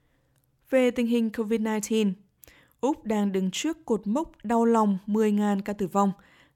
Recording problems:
none

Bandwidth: 17 kHz